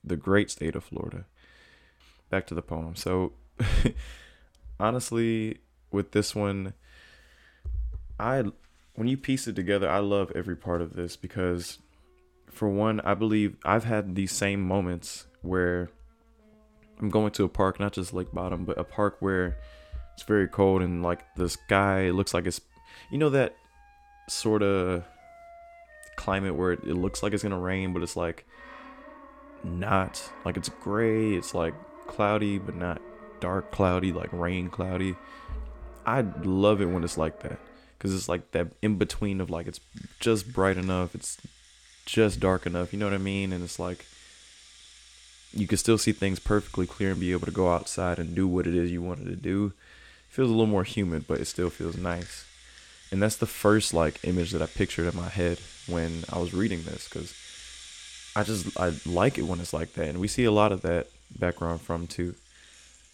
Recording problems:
background music; faint; throughout; 20 dB below the speech

